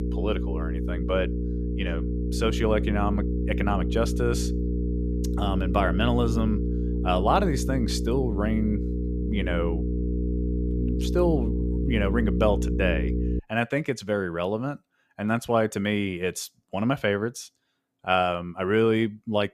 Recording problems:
electrical hum; loud; until 13 s; 60 Hz, 8 dB below the speech

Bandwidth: 14.5 kHz